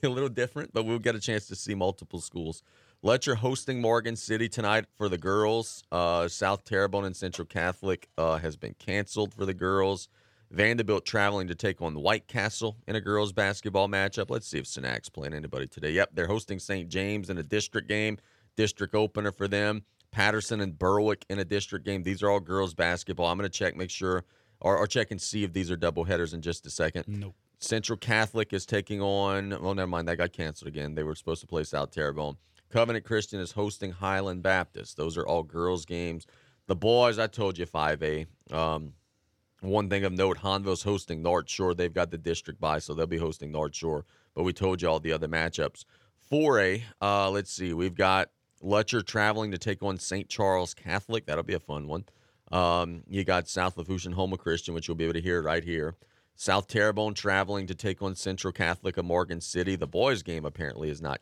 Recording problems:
none

